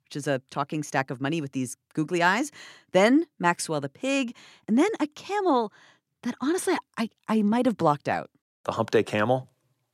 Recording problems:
none

